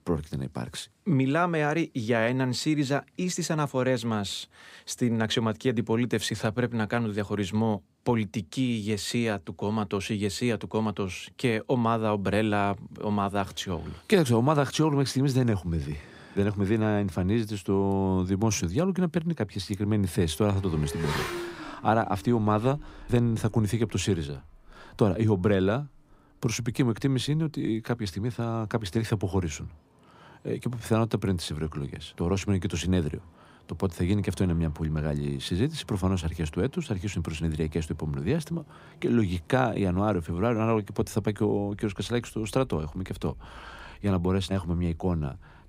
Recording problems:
traffic noise; noticeable; from 20 s on; 15 dB below the speech

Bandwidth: 15.5 kHz